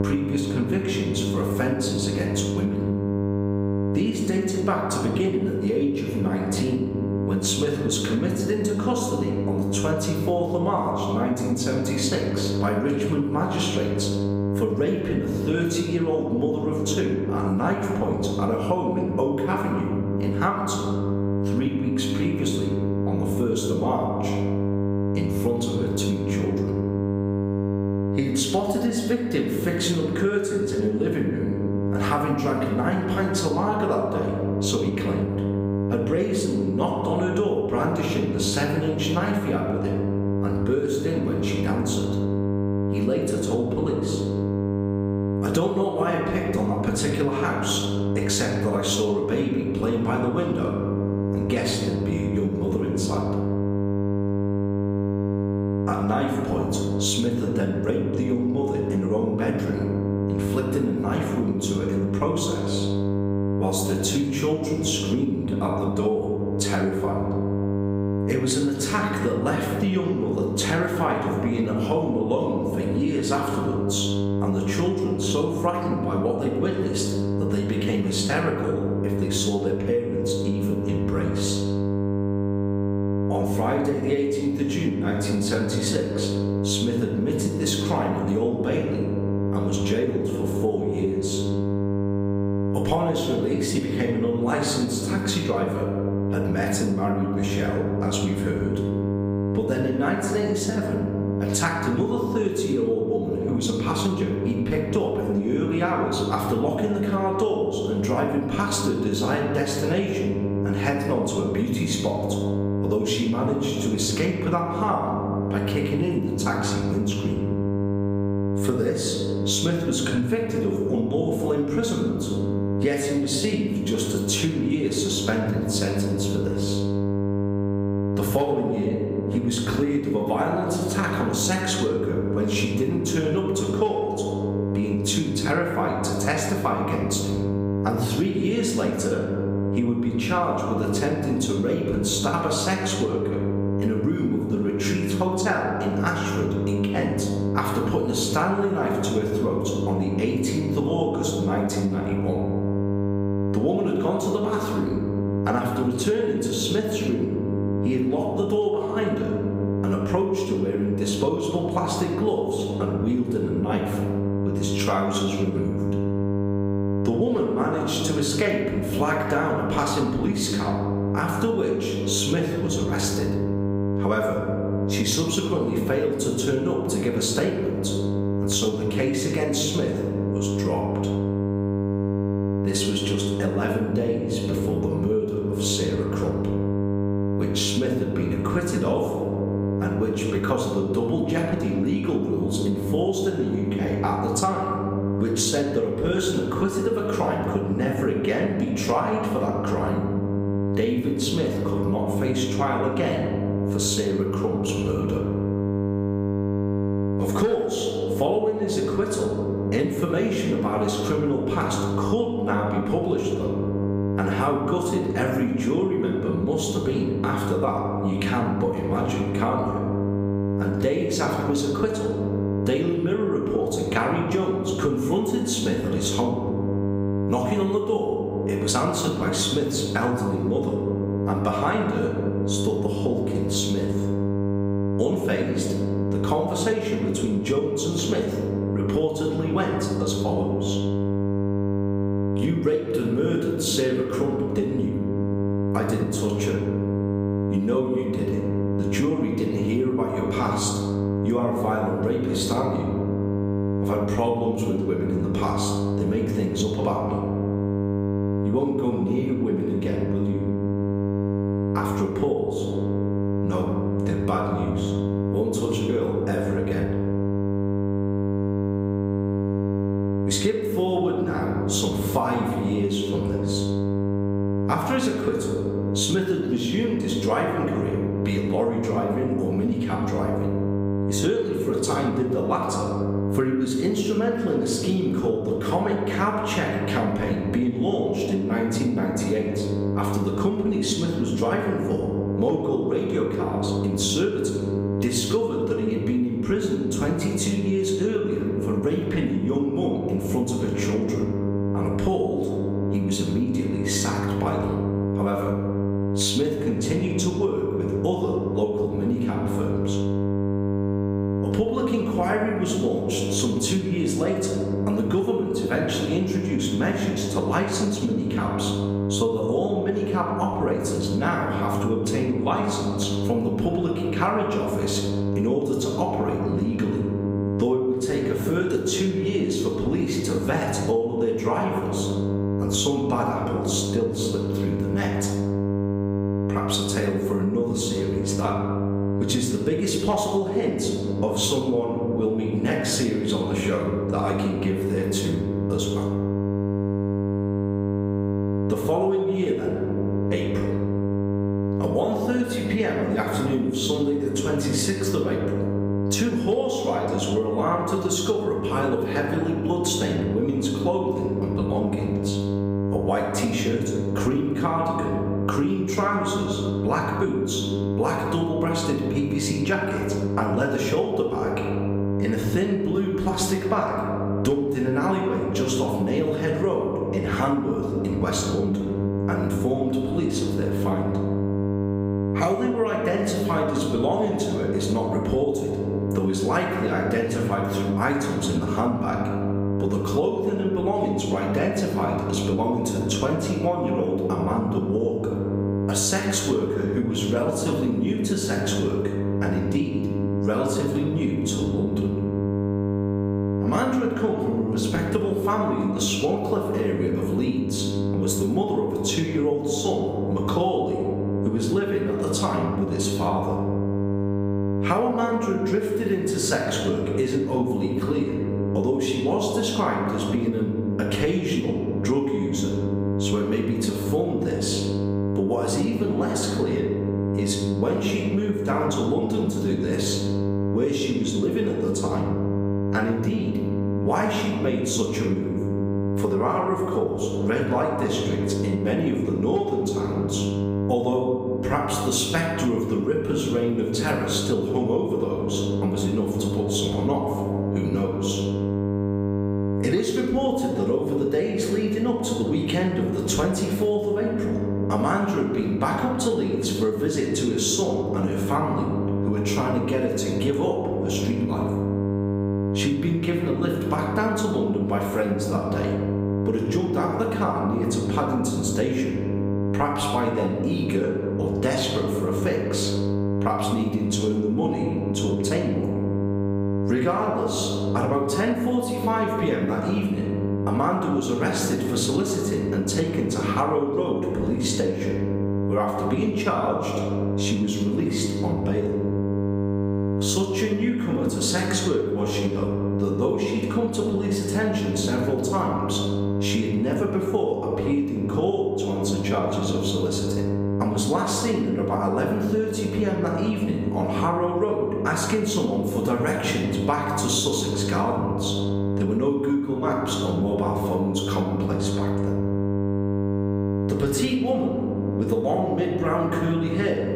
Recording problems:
room echo; noticeable; dies away in 1 s
off-mic speech; somewhat distant
squashed, flat; somewhat
electrical hum; loud; throughout; 50 Hz, 7 dB below the speech

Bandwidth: 15.5 kHz